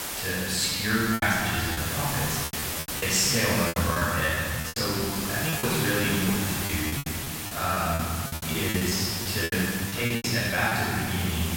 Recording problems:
room echo; strong; dies away in 2.5 s
off-mic speech; far
hiss; loud; throughout; 4 dB below the speech
choppy; very; 14% of the speech affected

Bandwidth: 16.5 kHz